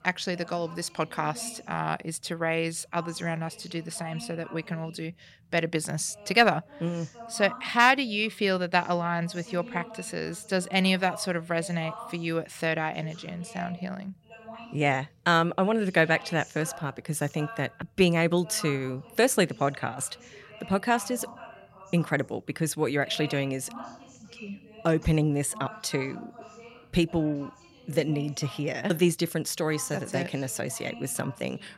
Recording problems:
voice in the background; noticeable; throughout; 20 dB below the speech

